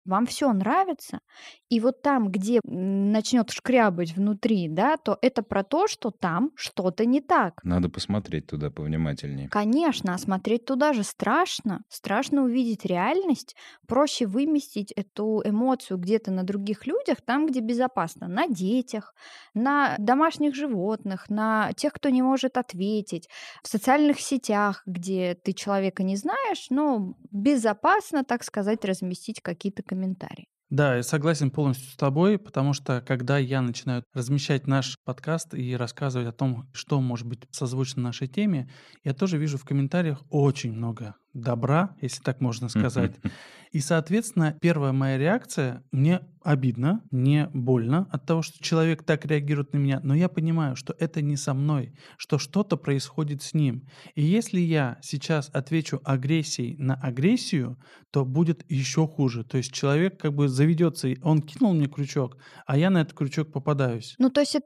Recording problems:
none

